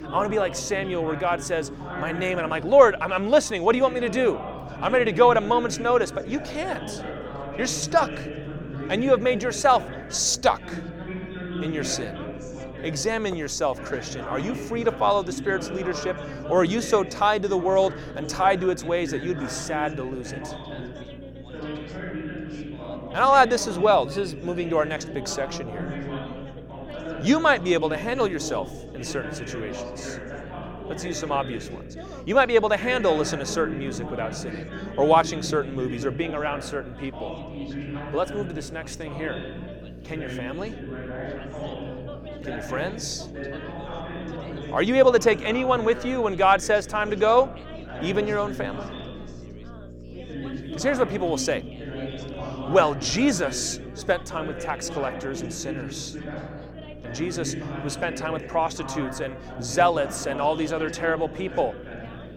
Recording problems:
background chatter; noticeable; throughout; 4 voices, 10 dB below the speech
electrical hum; faint; throughout; 60 Hz, 25 dB below the speech

